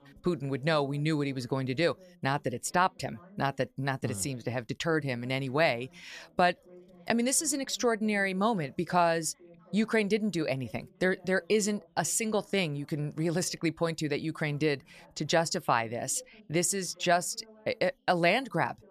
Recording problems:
background chatter; faint; throughout; 2 voices, 25 dB below the speech

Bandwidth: 14.5 kHz